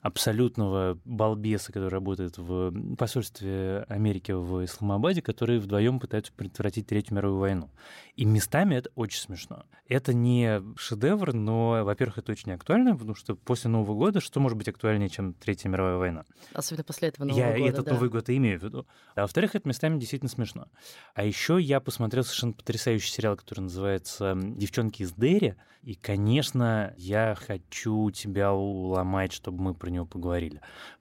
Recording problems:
none

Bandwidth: 16 kHz